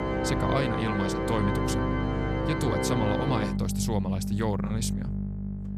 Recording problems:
background music; very loud; throughout; 1 dB above the speech
electrical hum; noticeable; throughout; 50 Hz, 15 dB below the speech

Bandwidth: 14.5 kHz